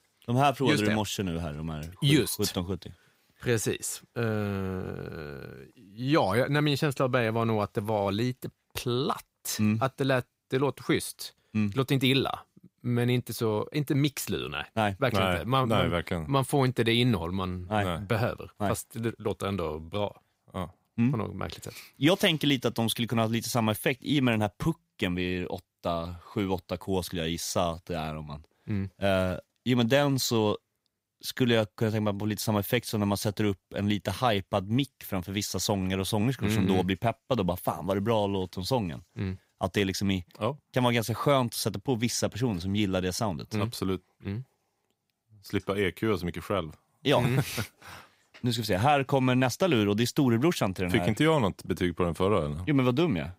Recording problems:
none

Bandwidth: 15.5 kHz